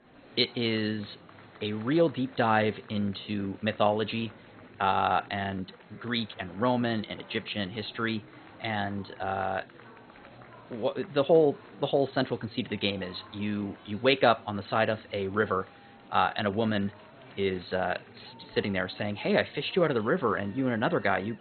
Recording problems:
garbled, watery; badly; nothing above 4 kHz
murmuring crowd; faint; throughout; 20 dB below the speech

